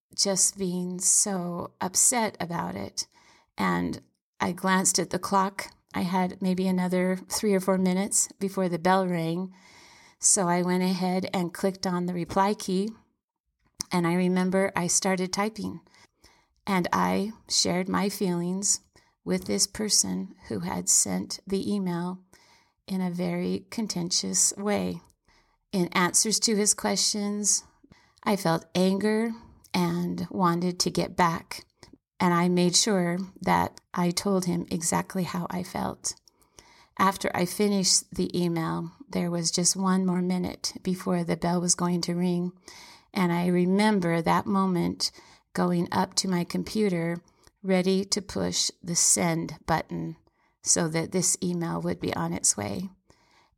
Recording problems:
none

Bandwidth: 17 kHz